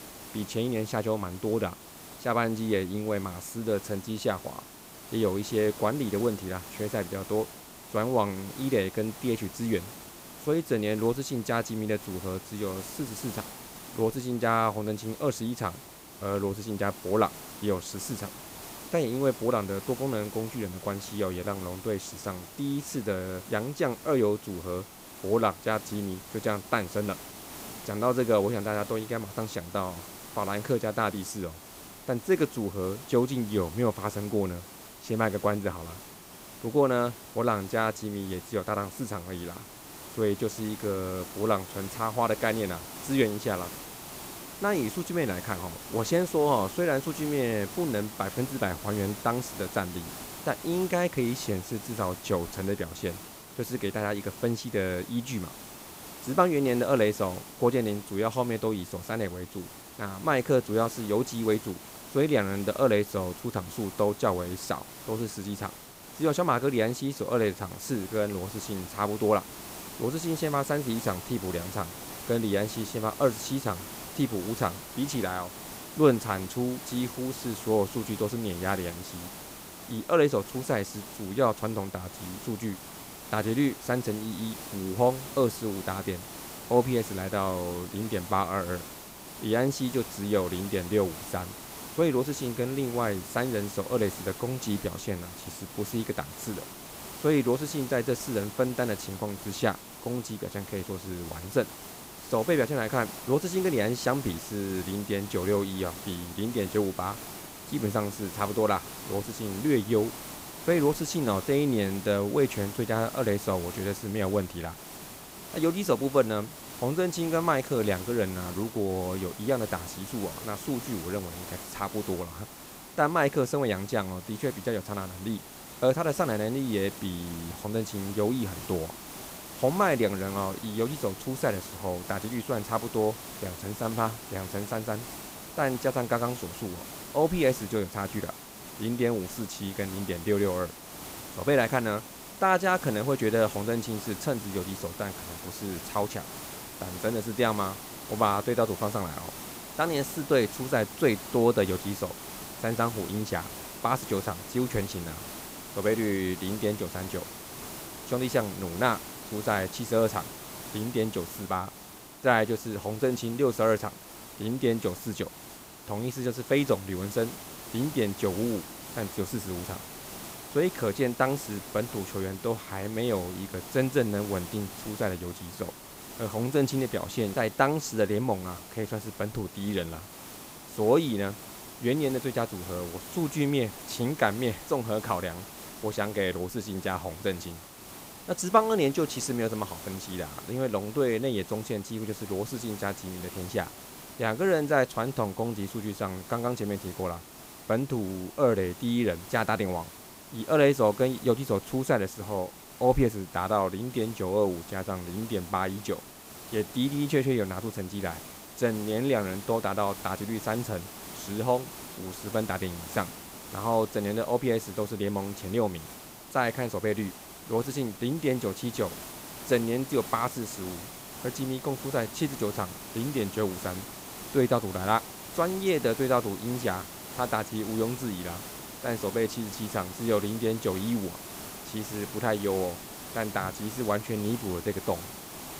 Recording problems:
hiss; noticeable; throughout; 10 dB below the speech

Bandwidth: 15.5 kHz